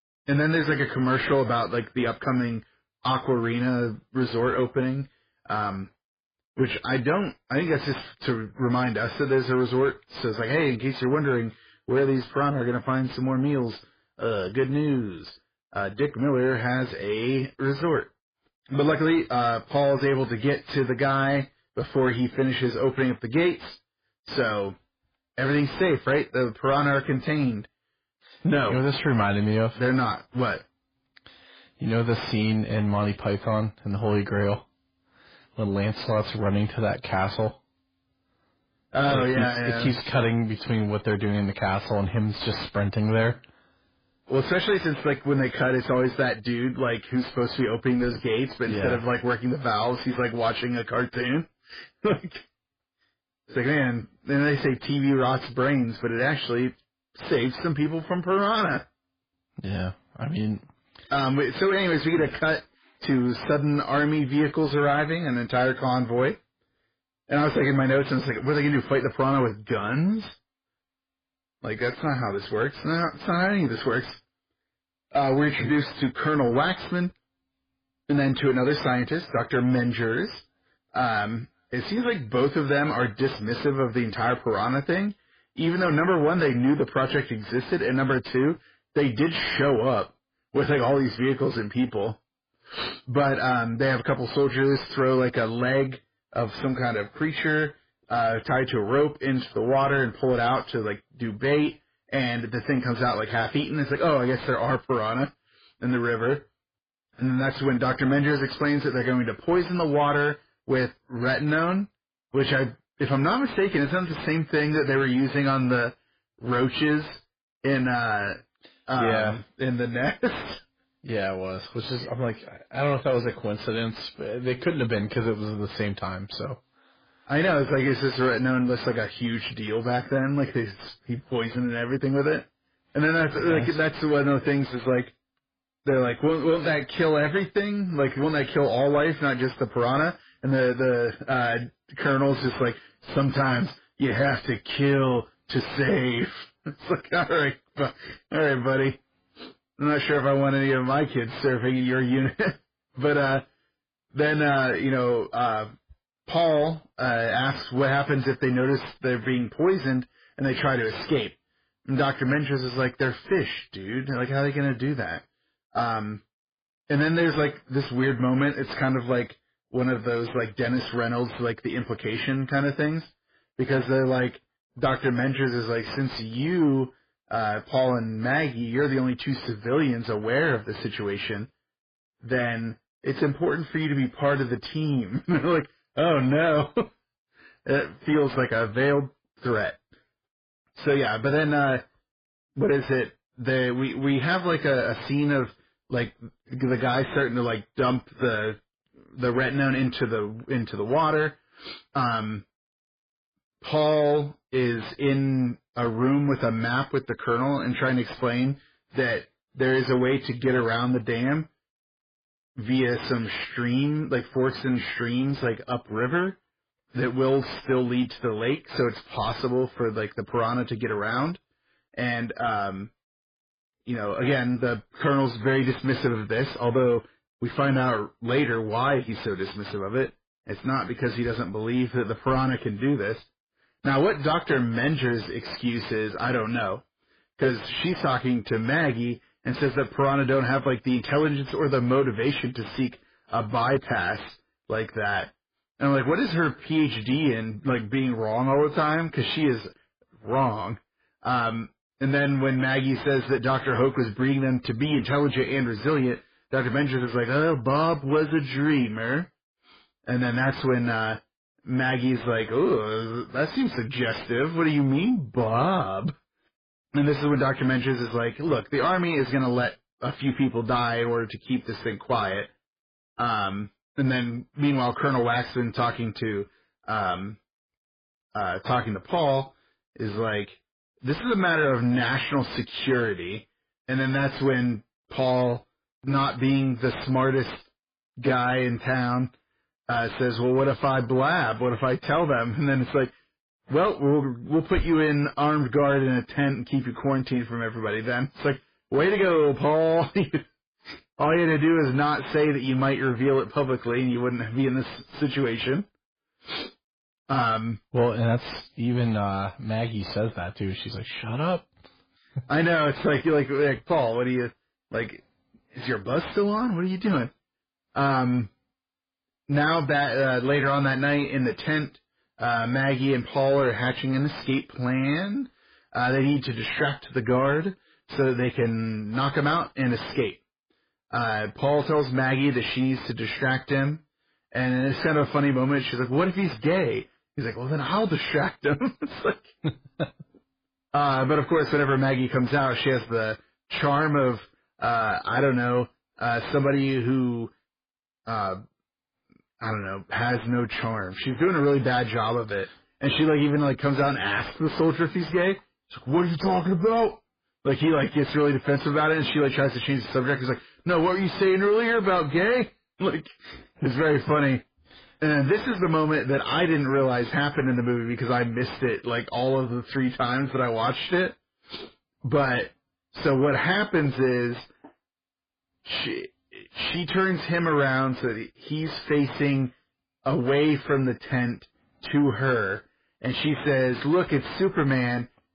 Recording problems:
garbled, watery; badly
distortion; slight; 10 dB below the speech

